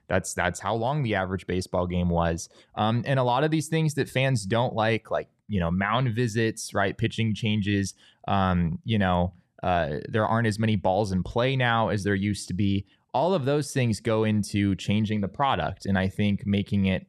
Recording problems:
none

